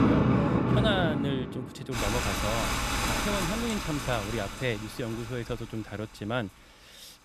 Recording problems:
rain or running water; very loud; throughout; 4 dB above the speech

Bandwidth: 14.5 kHz